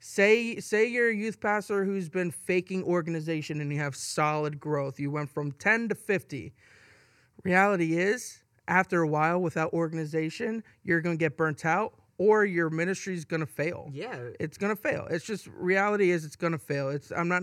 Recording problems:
abrupt cut into speech; at the end

